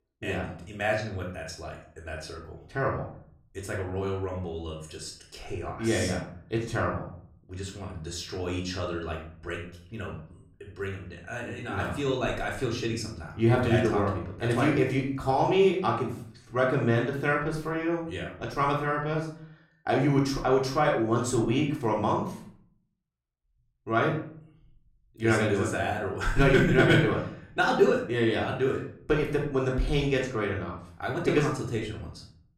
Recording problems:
off-mic speech; far
room echo; slight; dies away in 0.5 s

